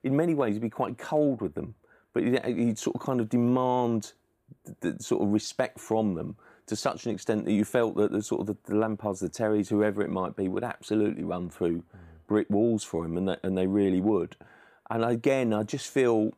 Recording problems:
none

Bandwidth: 15 kHz